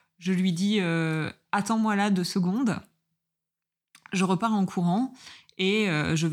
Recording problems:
abrupt cut into speech; at the end

